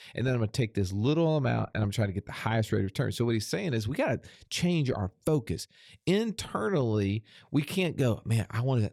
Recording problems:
none

